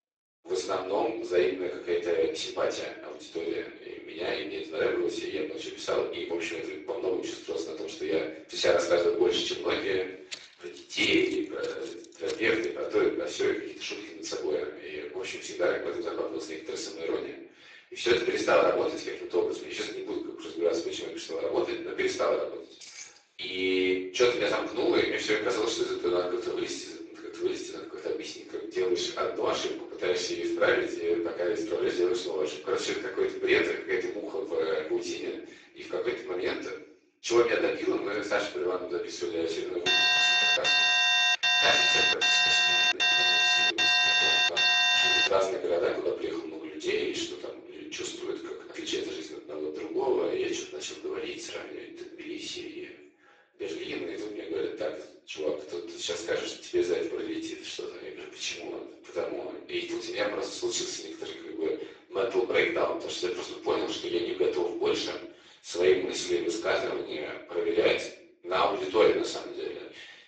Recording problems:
off-mic speech; far
garbled, watery; badly; nothing above 7.5 kHz
room echo; noticeable; dies away in 0.6 s
thin; somewhat; fading below 350 Hz
footsteps; noticeable; from 10 to 13 s; peak 8 dB below the speech
jangling keys; faint; at 23 s; peak 15 dB below the speech
alarm; loud; from 40 to 45 s; peak 10 dB above the speech

